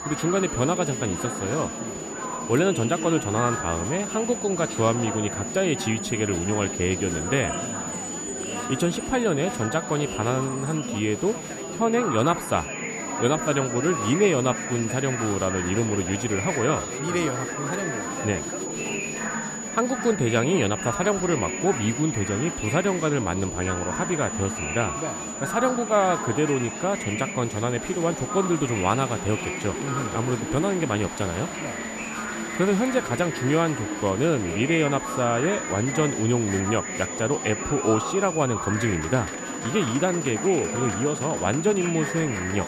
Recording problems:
high-pitched whine; loud; throughout; 7 kHz, 8 dB below the speech
murmuring crowd; loud; throughout; 7 dB below the speech

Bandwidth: 14.5 kHz